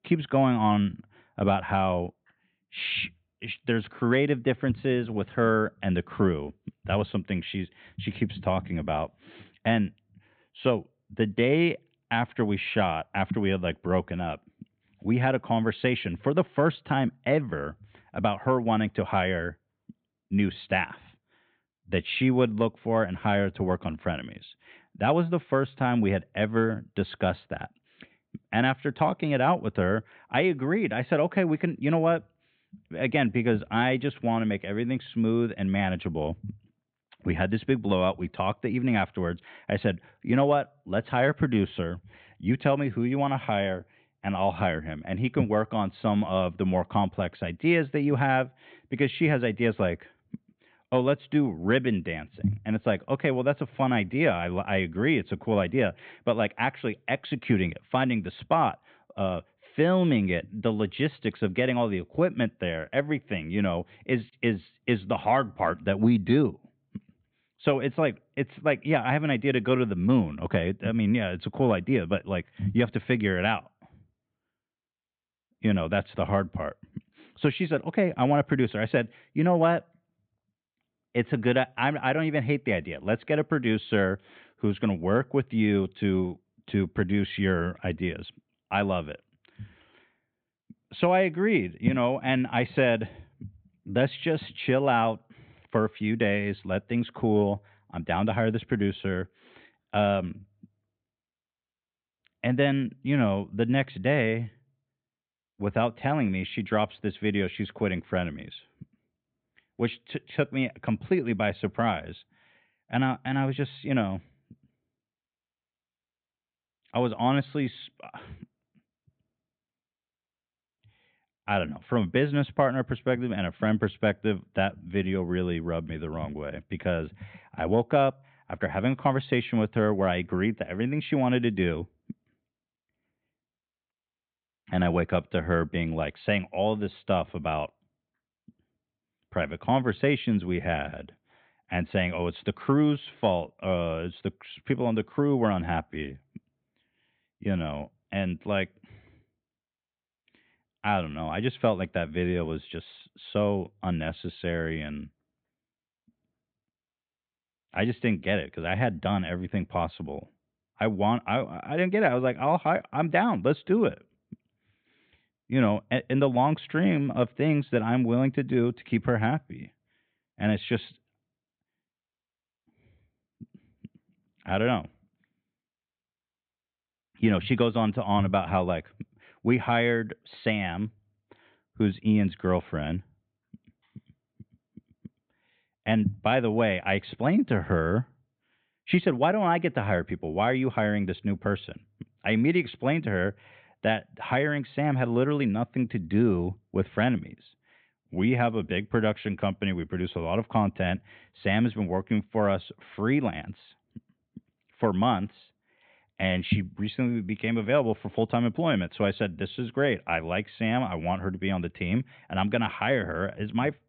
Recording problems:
high frequencies cut off; severe; nothing above 4 kHz

